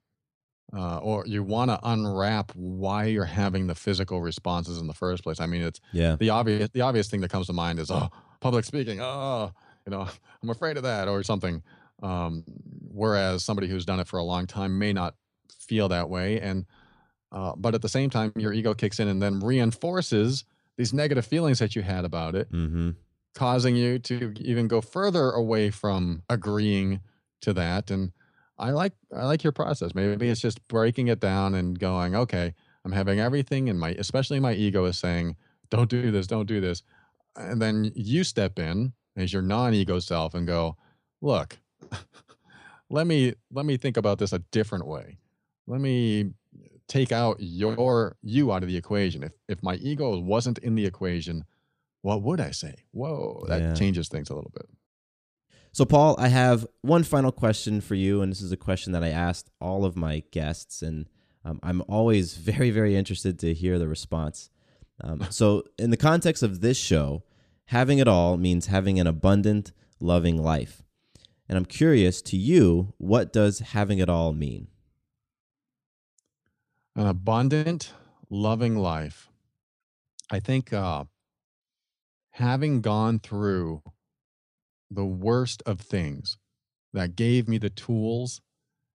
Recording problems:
none

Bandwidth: 14.5 kHz